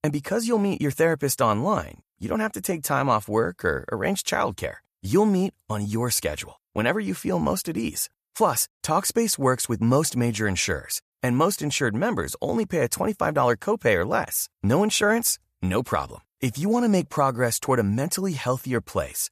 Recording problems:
none

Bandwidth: 14.5 kHz